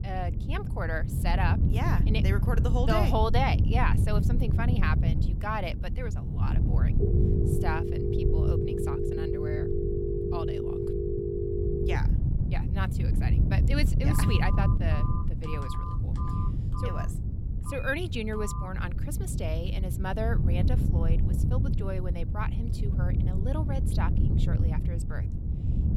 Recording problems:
wind noise on the microphone; heavy; 7 dB below the speech
phone ringing; loud; from 7 to 12 s; peak 4 dB above the speech
phone ringing; noticeable; from 14 to 19 s; peak 5 dB below the speech

